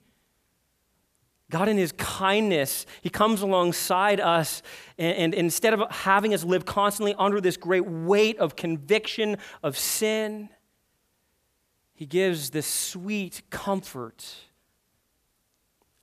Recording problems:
none

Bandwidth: 14.5 kHz